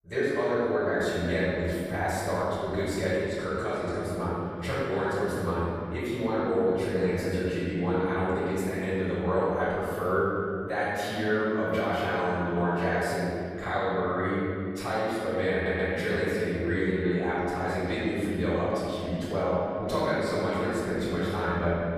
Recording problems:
room echo; strong; dies away in 2.4 s
off-mic speech; far
audio stuttering; at 16 s

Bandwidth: 14.5 kHz